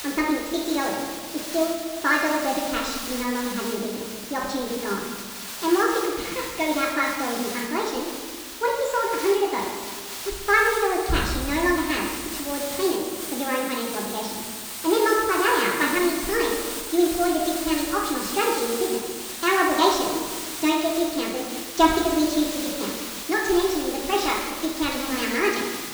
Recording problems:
off-mic speech; far
wrong speed and pitch; too fast and too high; 1.5 times normal speed
room echo; noticeable; dies away in 1.3 s
high frequencies cut off; noticeable; nothing above 8 kHz
hiss; loud; throughout; 8 dB below the speech

